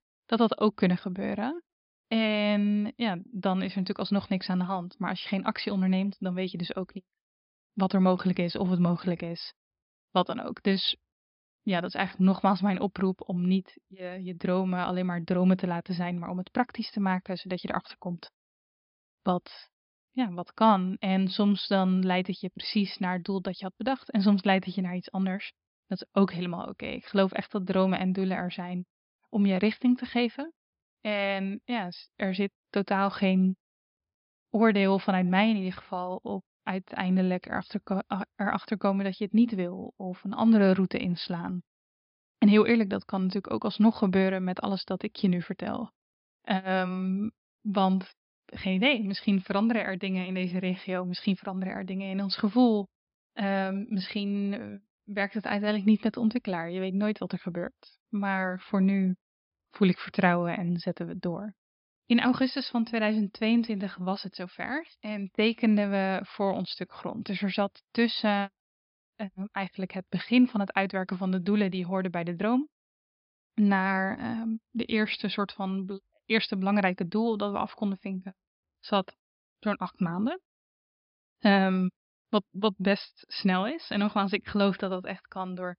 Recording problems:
high frequencies cut off; noticeable; nothing above 5.5 kHz

